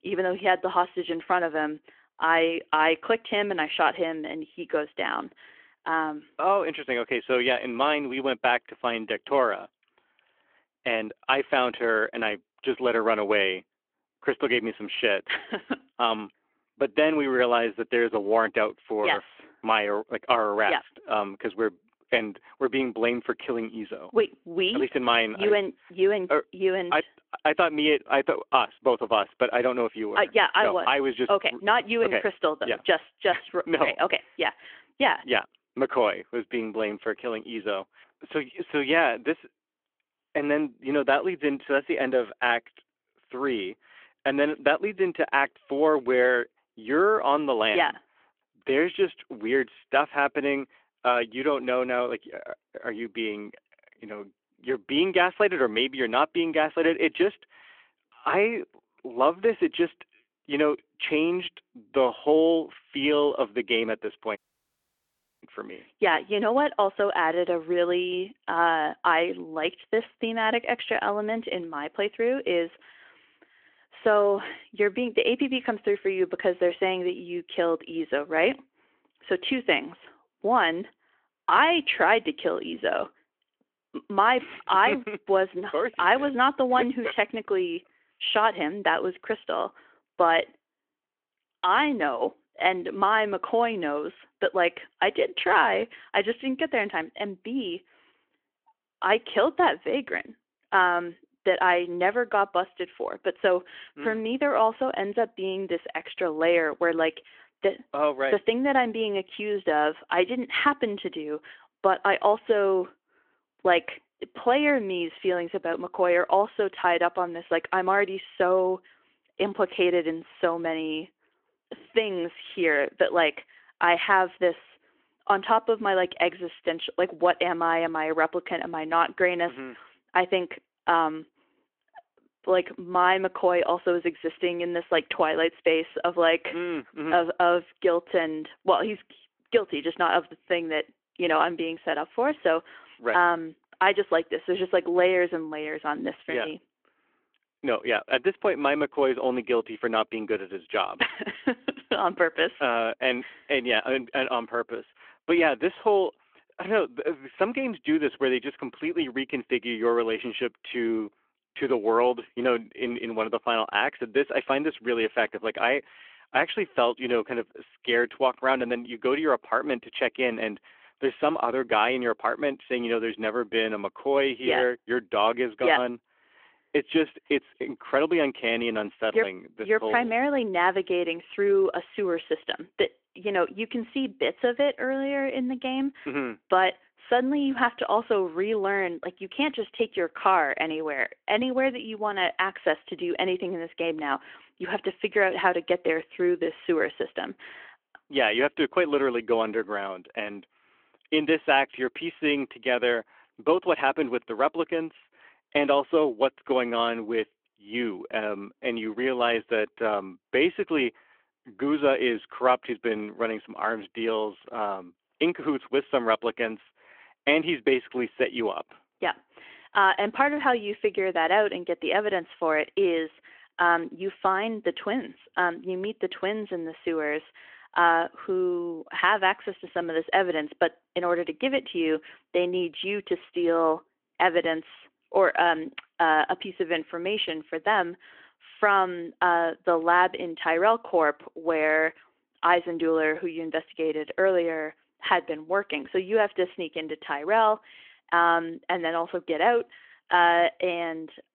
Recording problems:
phone-call audio
audio cutting out; at 1:04 for 1 s

